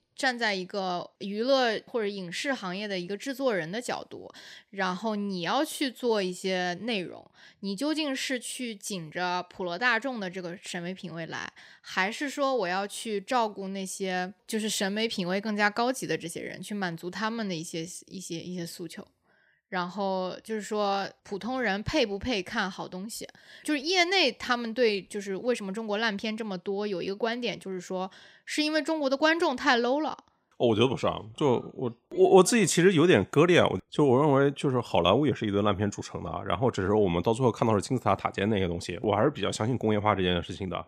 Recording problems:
none

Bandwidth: 15.5 kHz